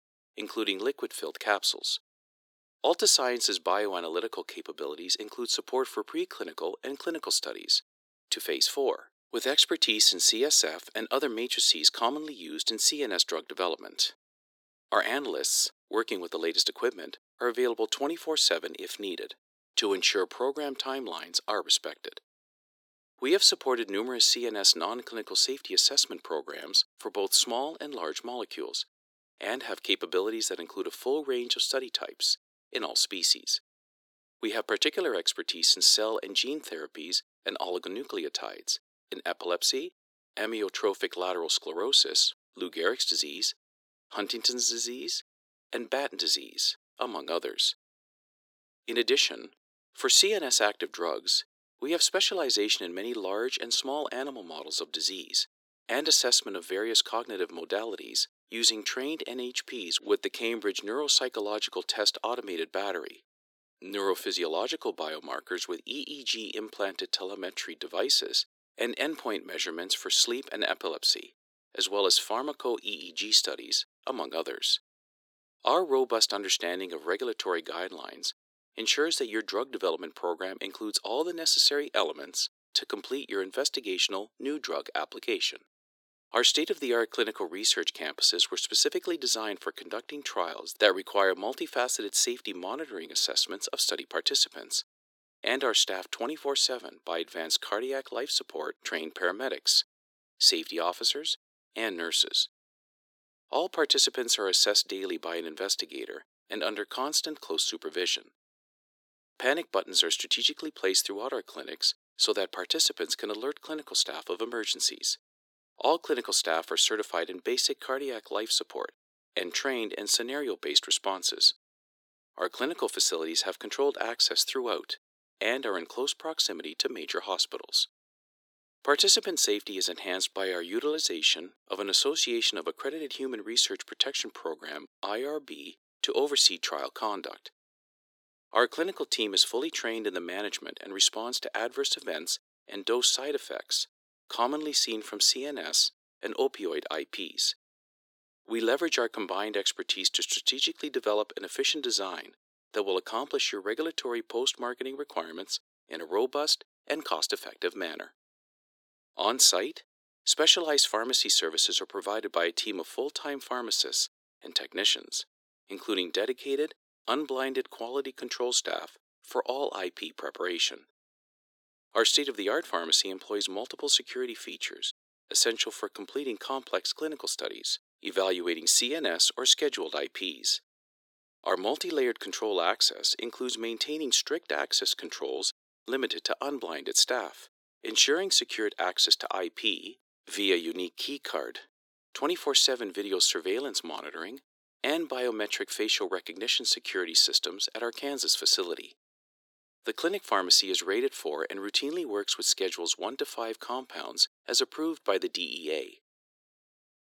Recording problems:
thin; very; fading below 300 Hz

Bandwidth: 18 kHz